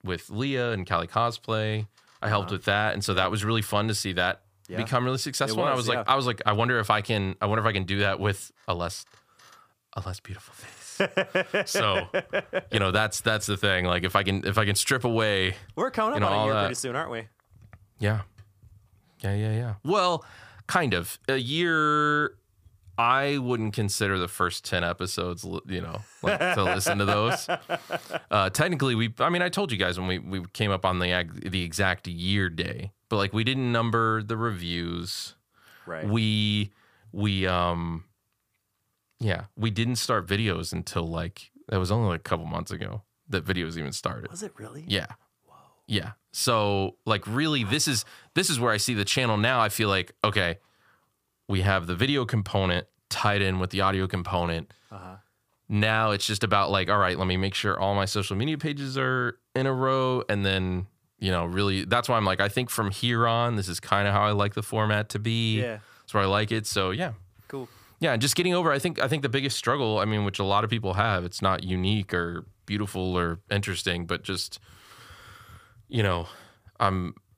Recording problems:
none

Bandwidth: 15 kHz